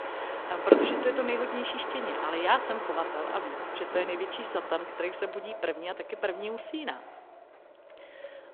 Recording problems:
phone-call audio
wind in the background; very loud; throughout; as loud as the speech

